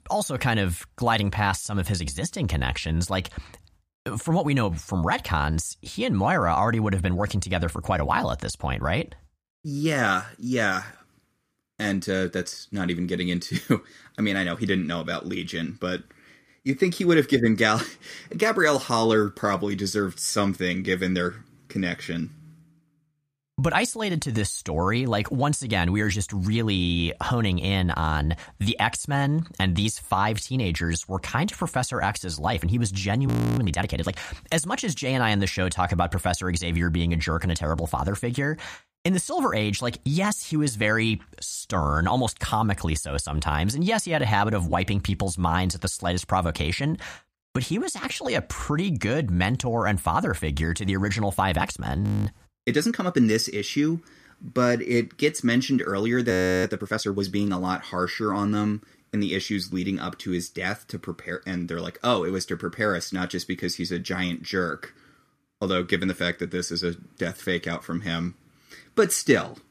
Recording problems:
audio freezing; at 33 s, at 52 s and at 56 s

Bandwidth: 15 kHz